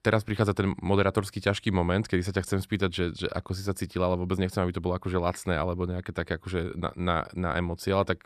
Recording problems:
none

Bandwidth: 14 kHz